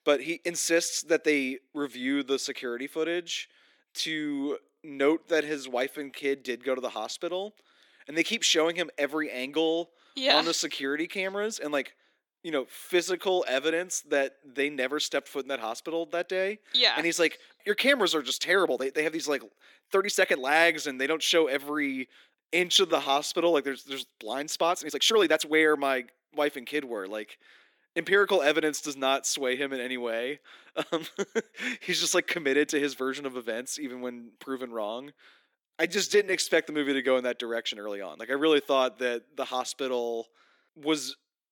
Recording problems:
thin; very slightly; fading below 250 Hz
uneven, jittery; strongly; from 1.5 to 38 s

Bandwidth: 17.5 kHz